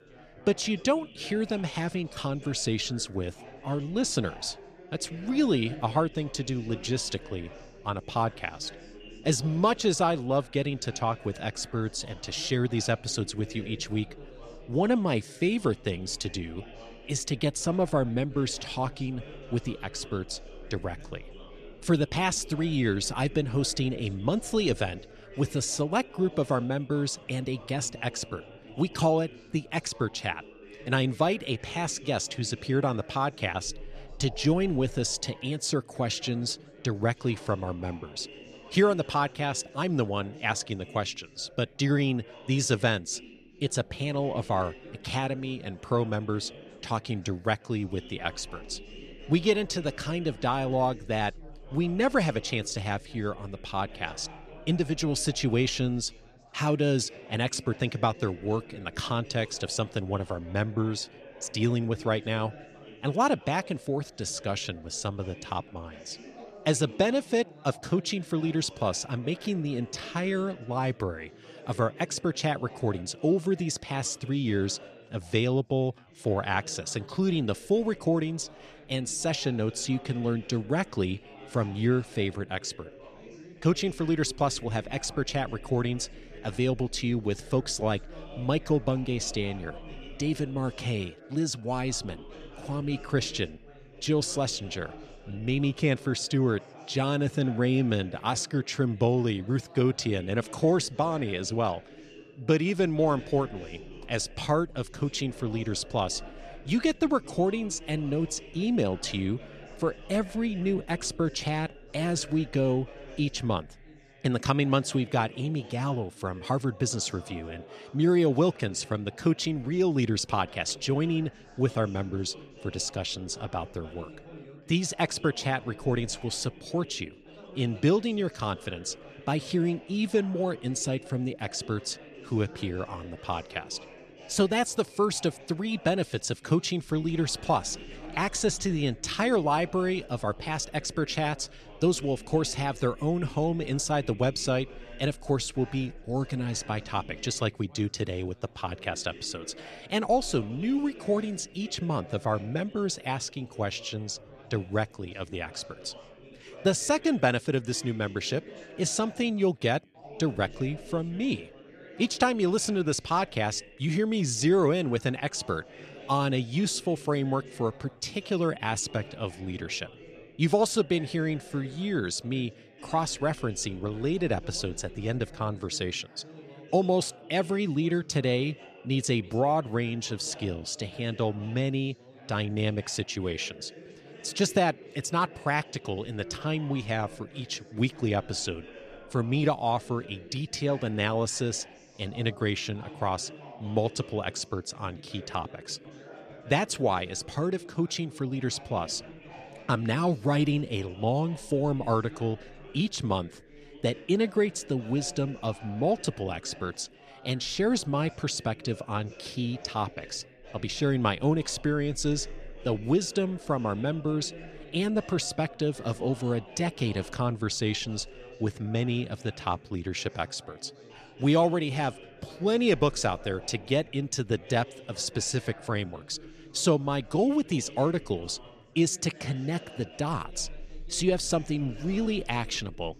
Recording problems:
background chatter; noticeable; throughout; 4 voices, 20 dB below the speech

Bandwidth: 13.5 kHz